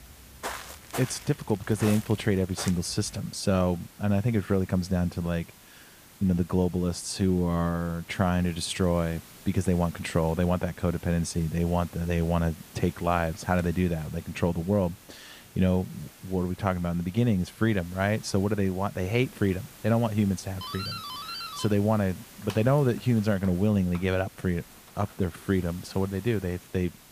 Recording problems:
hiss; faint; throughout; 20 dB below the speech
footsteps; noticeable; until 3 s; peak 8 dB below the speech
doorbell; noticeable; from 21 to 25 s; peak 7 dB below the speech

